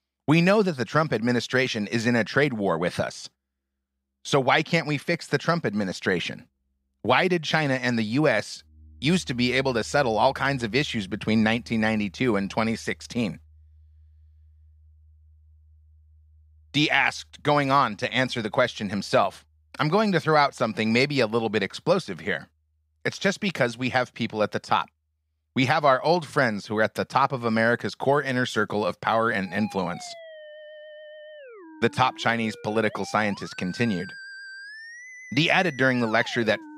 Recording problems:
background music; faint; throughout; 20 dB below the speech

